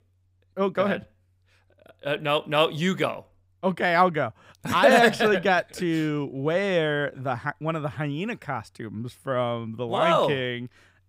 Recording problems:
none

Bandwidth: 15.5 kHz